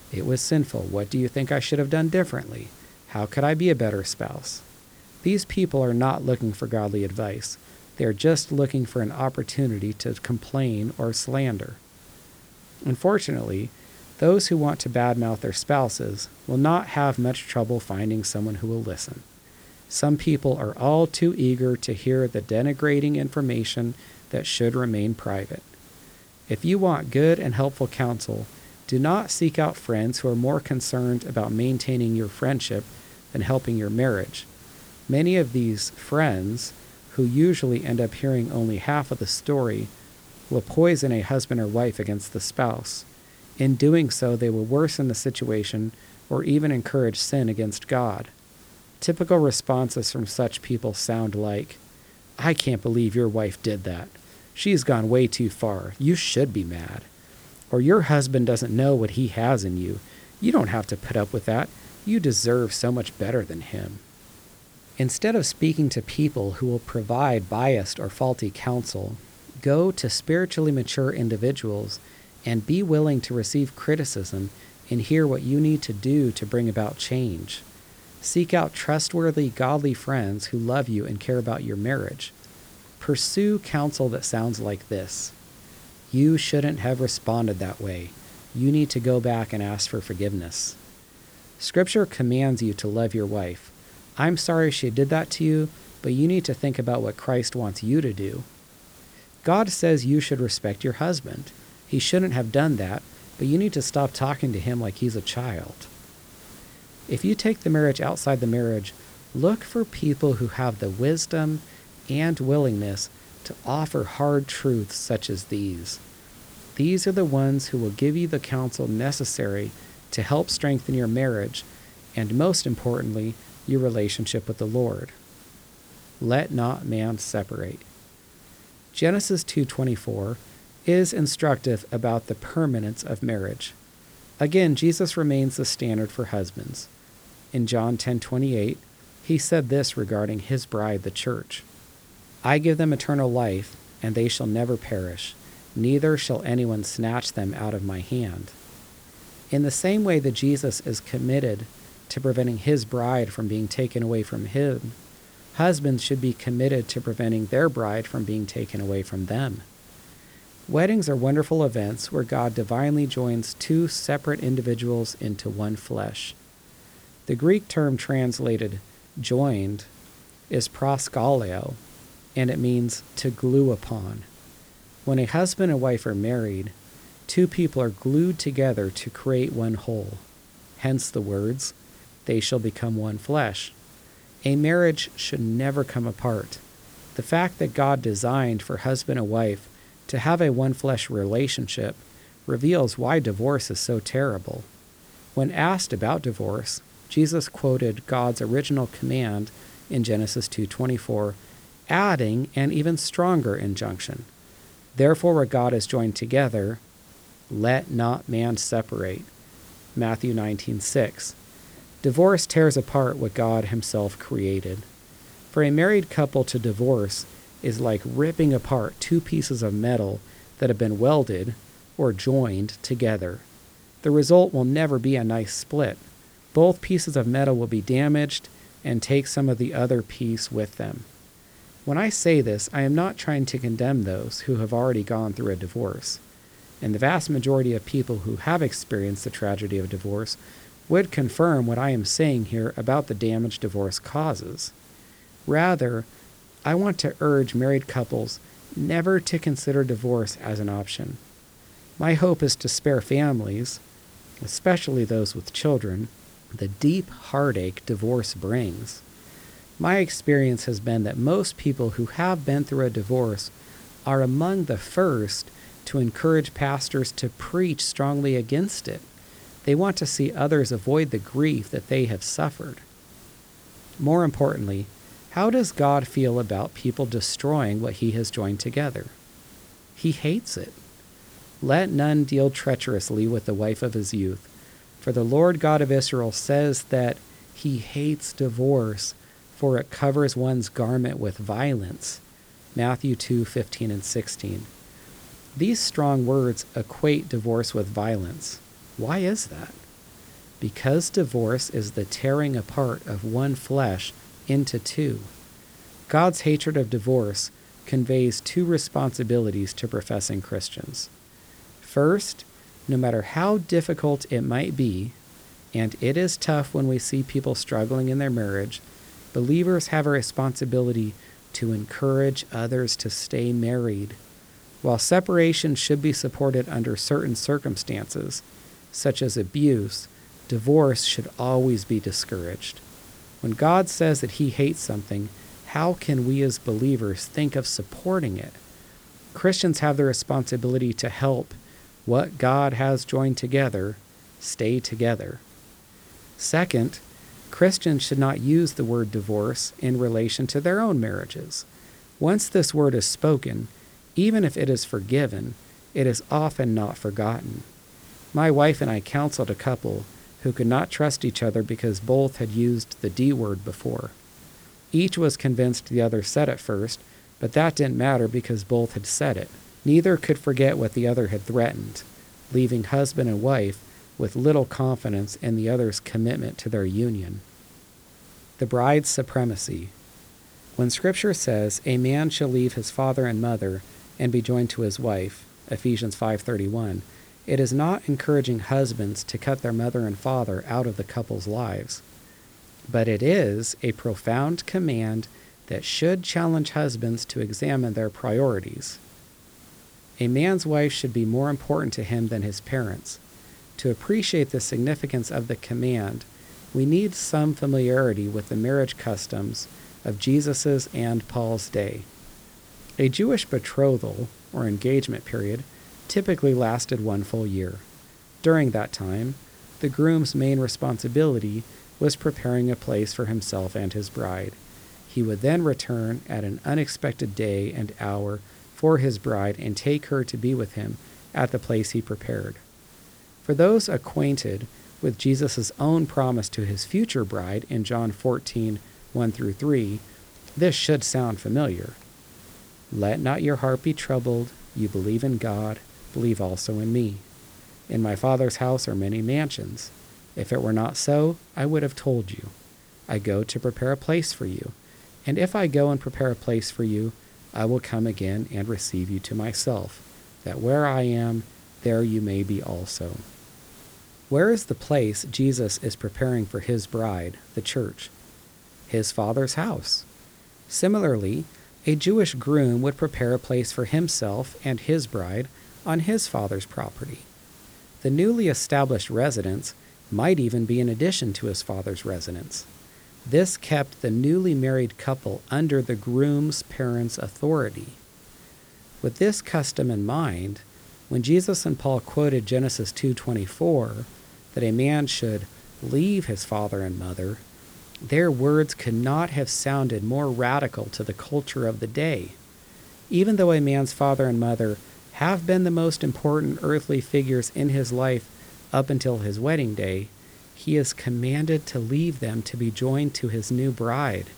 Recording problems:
hiss; faint; throughout; 25 dB below the speech

